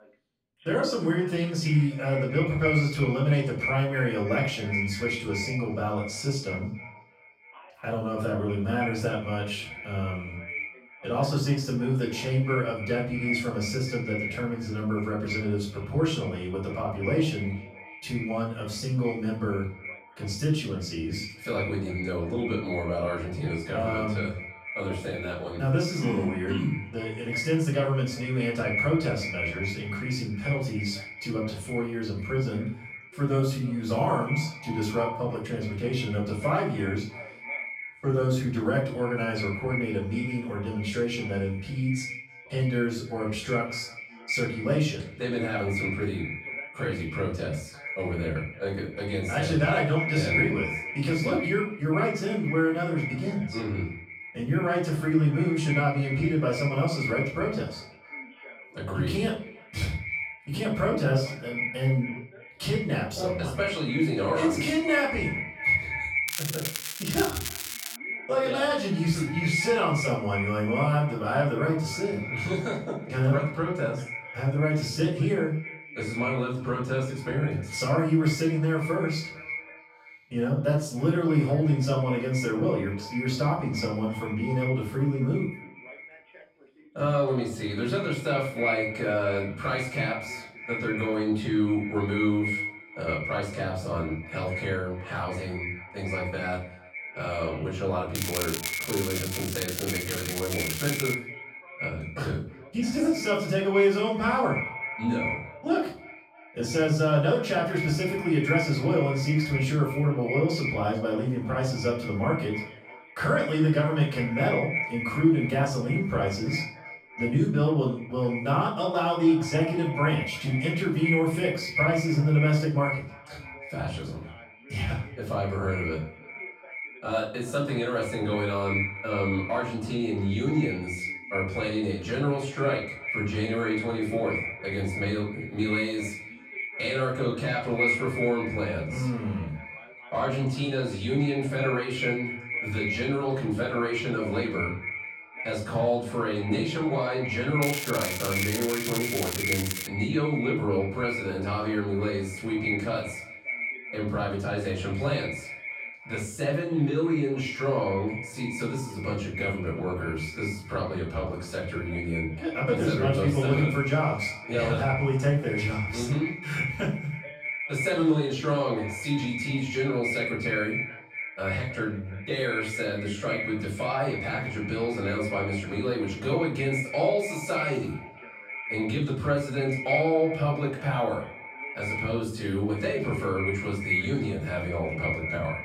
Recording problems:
echo of what is said; strong; throughout; 320 ms later, 7 dB below the speech
off-mic speech; far
room echo; noticeable; dies away in 0.4 s
crackling; loud; from 1:06 to 1:08, from 1:38 to 1:41 and from 2:28 to 2:30; 4 dB below the speech
voice in the background; faint; throughout; 25 dB below the speech

